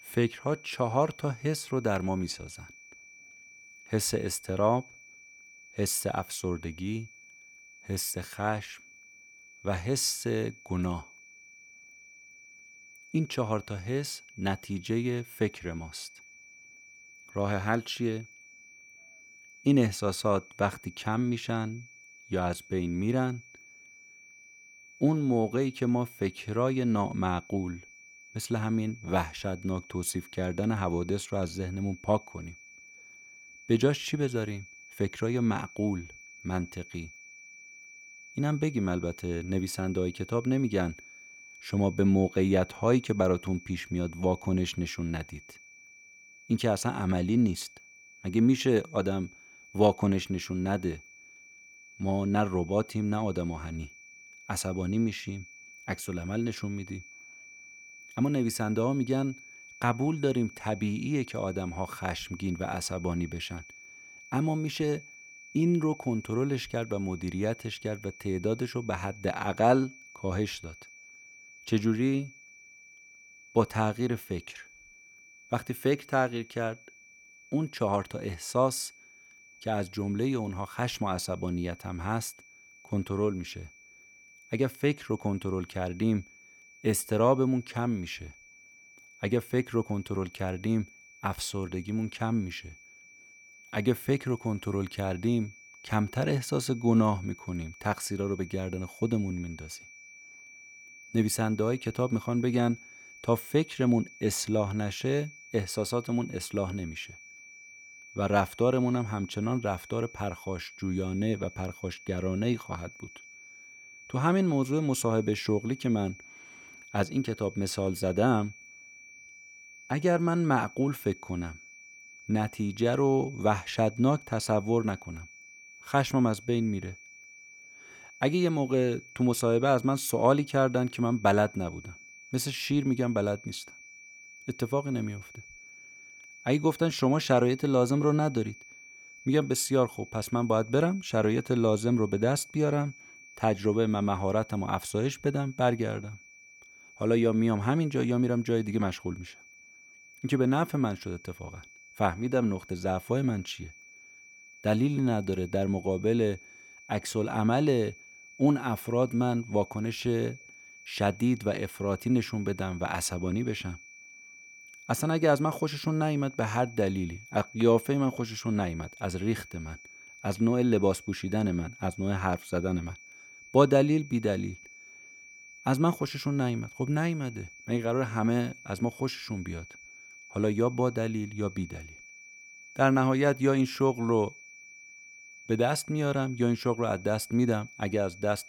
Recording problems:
high-pitched whine; noticeable; throughout; 2.5 kHz, 20 dB below the speech

